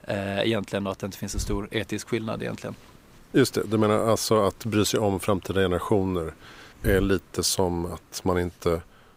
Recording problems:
hiss; noticeable; throughout; 20 dB below the speech

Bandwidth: 15.5 kHz